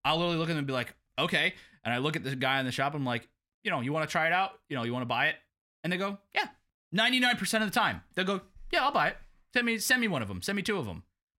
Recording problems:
none

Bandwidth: 16 kHz